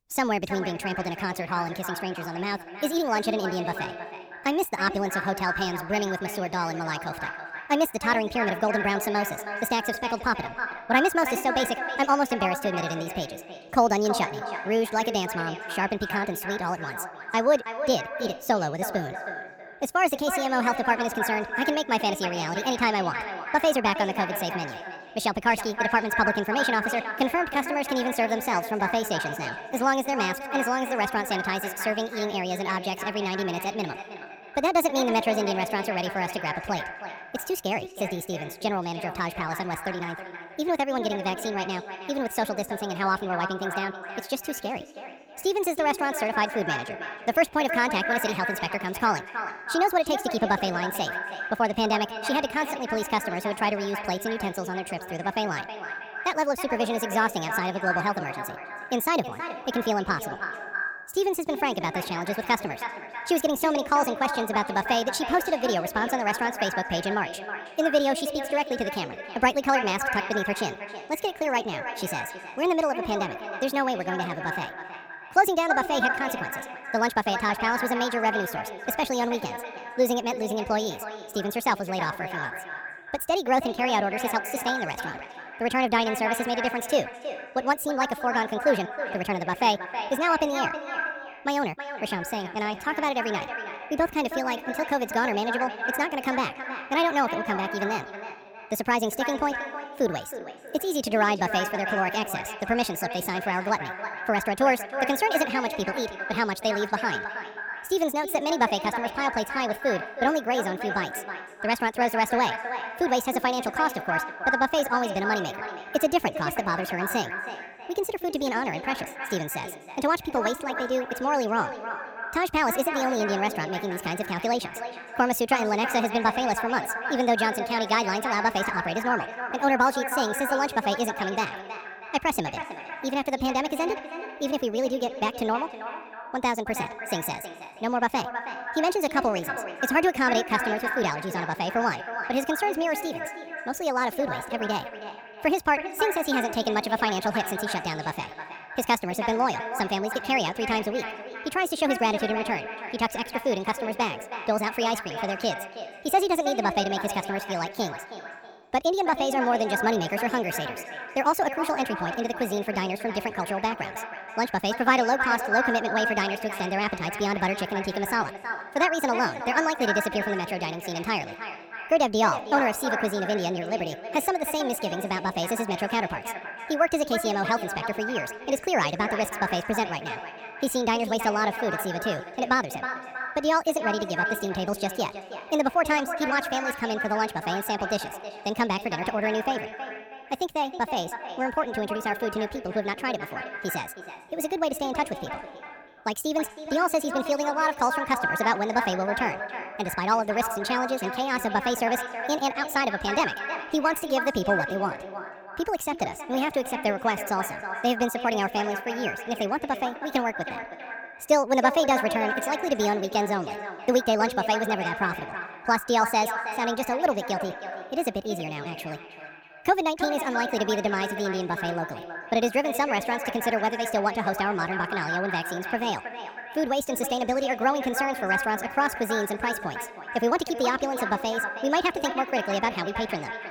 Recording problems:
echo of what is said; strong; throughout; 320 ms later, 7 dB below the speech
wrong speed and pitch; too fast and too high; 1.6 times normal speed

